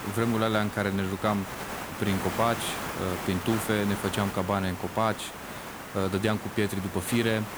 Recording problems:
hiss; loud; throughout; 8 dB below the speech

